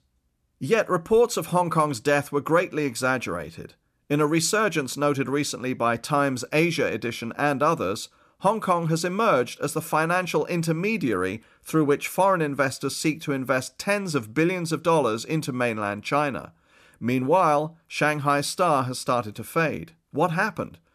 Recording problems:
none

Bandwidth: 14.5 kHz